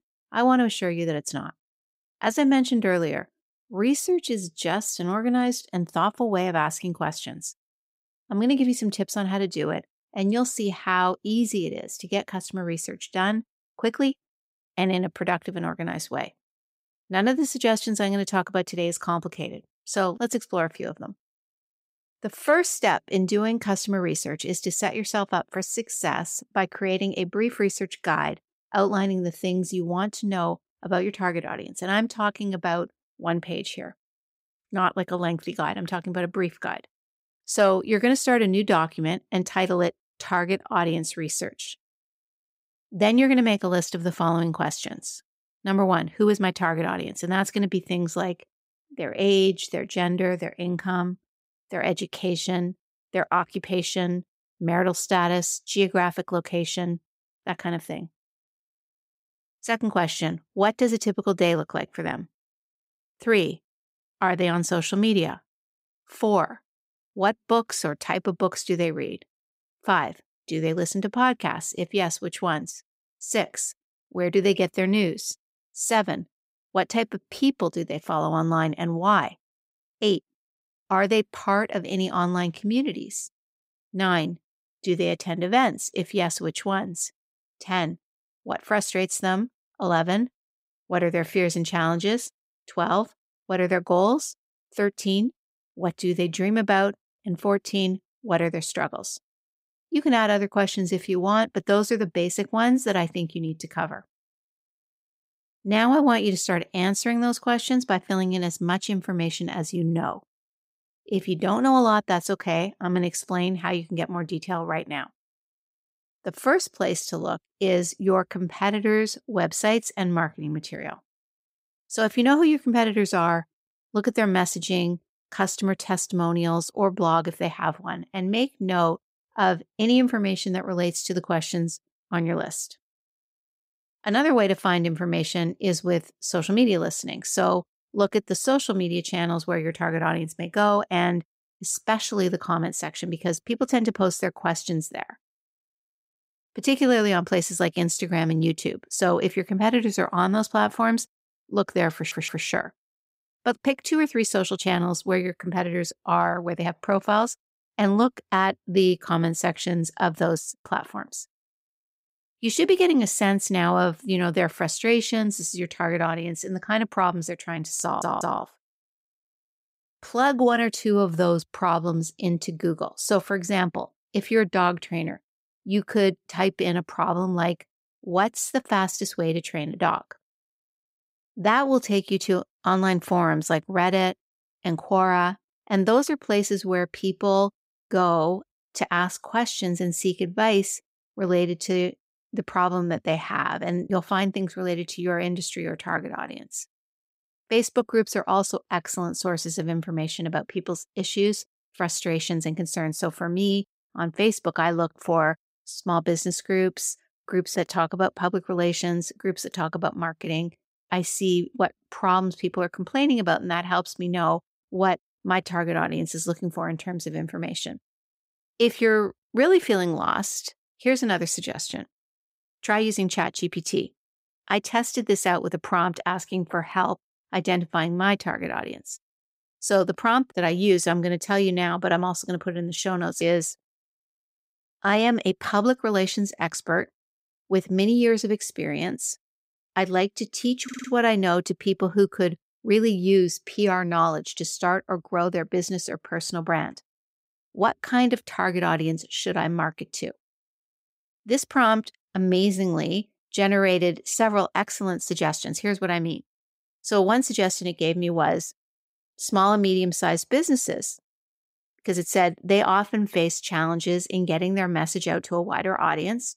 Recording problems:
audio stuttering; at 2:32, at 2:48 and at 4:01

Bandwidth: 15.5 kHz